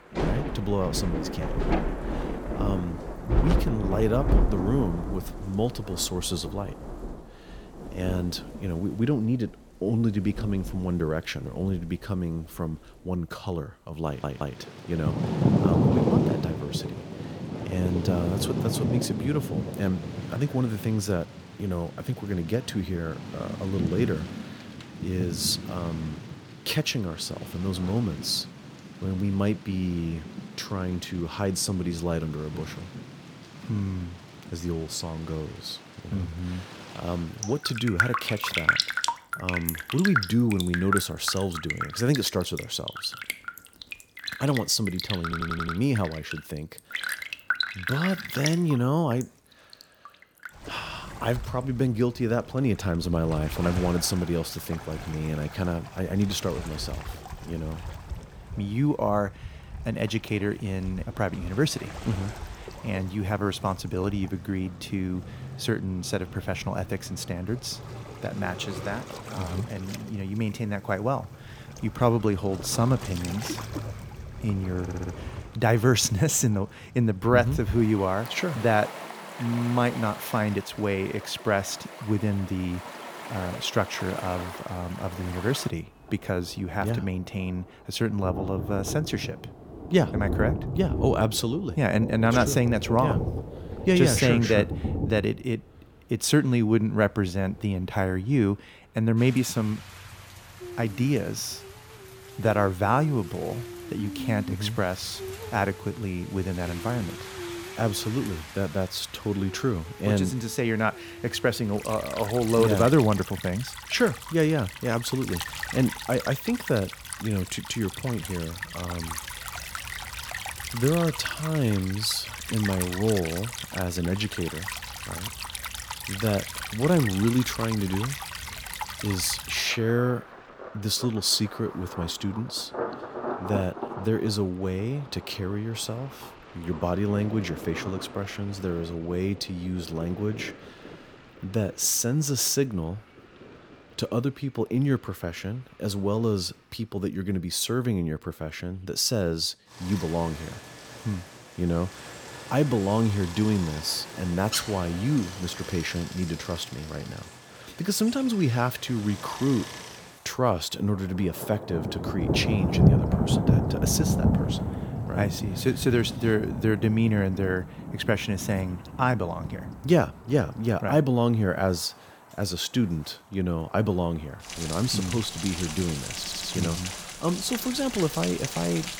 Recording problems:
rain or running water; loud; throughout; 6 dB below the speech
audio stuttering; 4 times, first at 14 s

